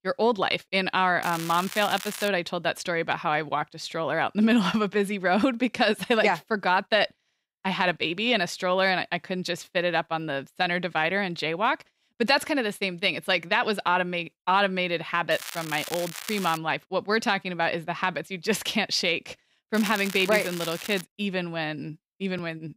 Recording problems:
crackling; noticeable; from 1 to 2.5 s, from 15 to 17 s and from 20 to 21 s; 10 dB below the speech

